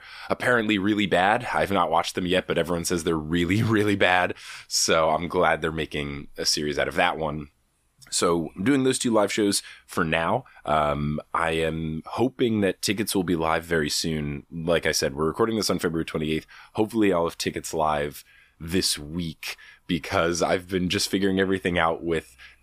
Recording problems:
none

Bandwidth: 15 kHz